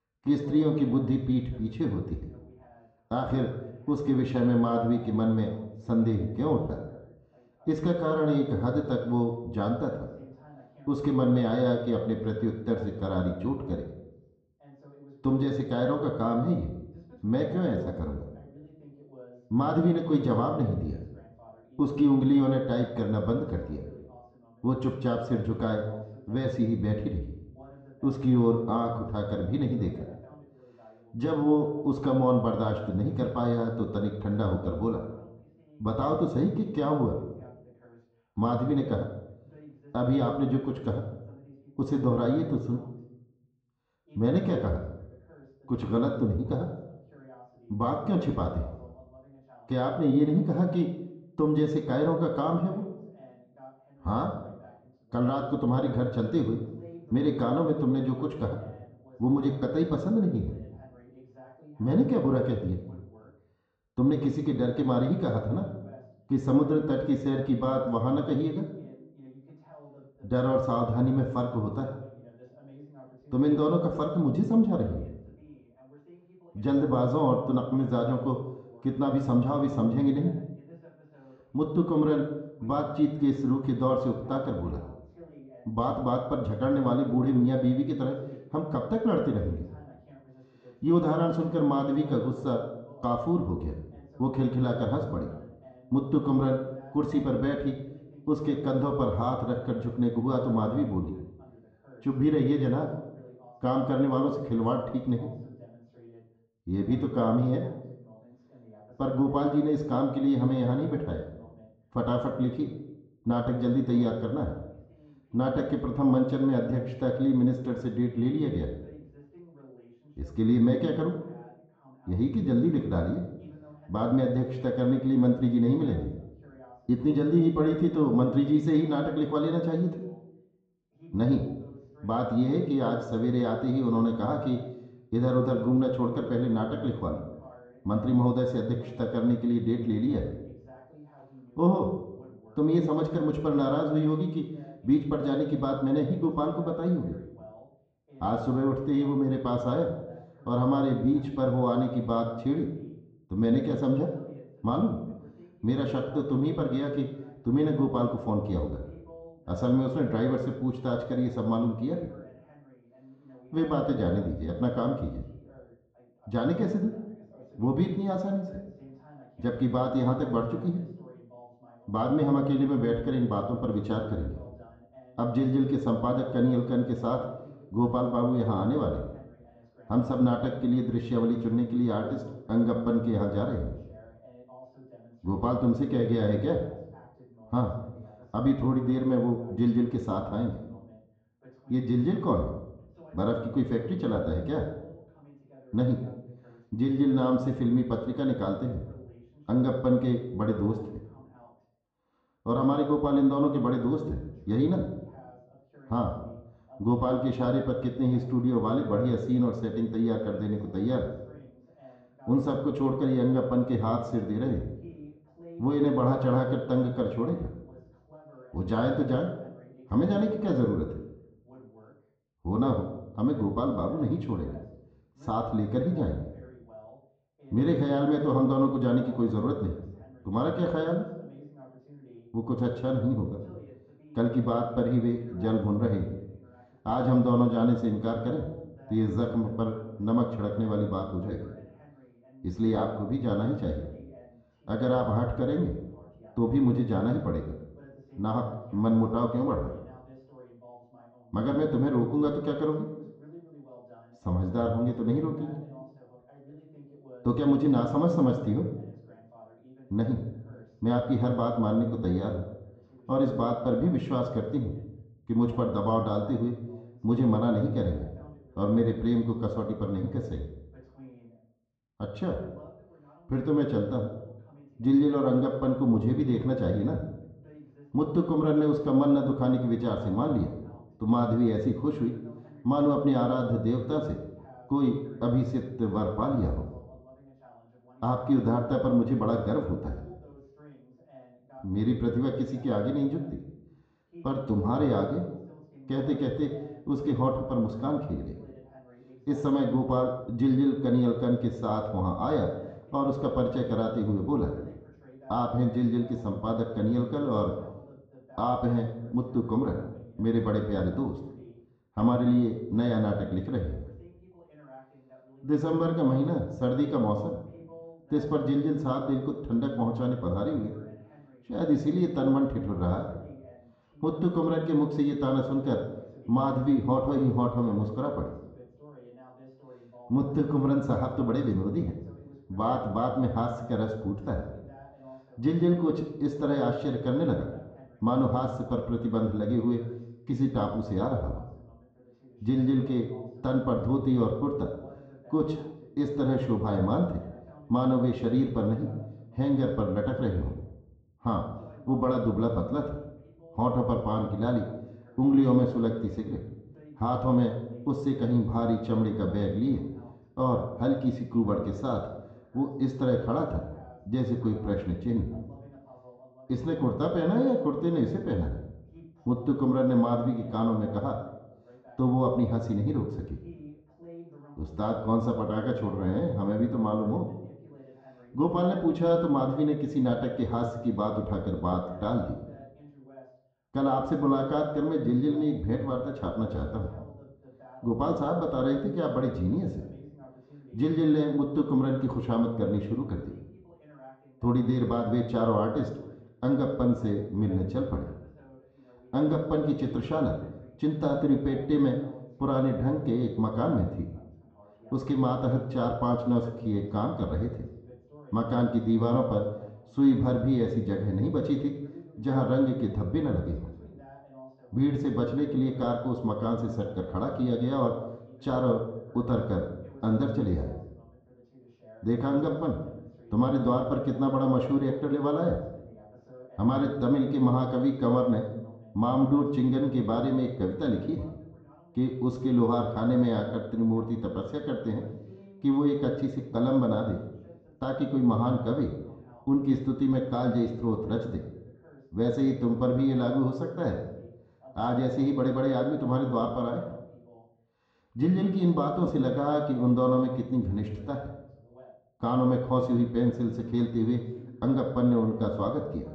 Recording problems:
muffled; very; fading above 2.5 kHz
high frequencies cut off; noticeable; nothing above 8 kHz
room echo; slight; dies away in 0.6 s
off-mic speech; somewhat distant
voice in the background; faint; throughout; 25 dB below the speech

